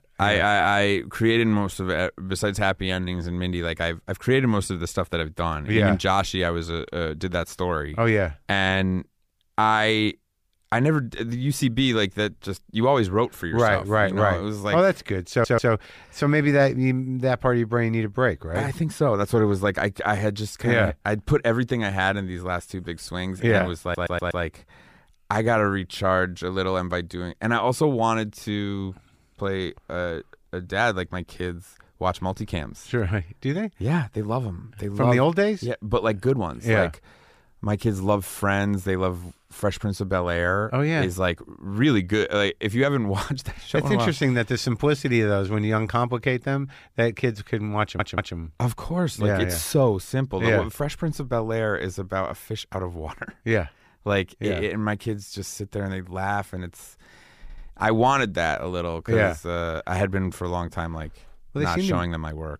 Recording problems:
audio stuttering; 4 times, first at 15 s

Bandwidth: 15 kHz